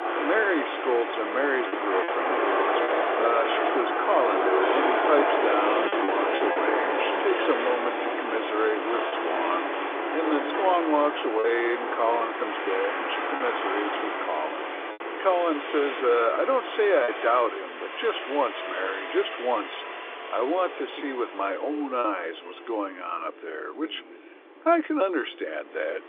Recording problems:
phone-call audio; nothing above 3.5 kHz
traffic noise; loud; throughout; as loud as the speech
choppy; occasionally; 2% of the speech affected

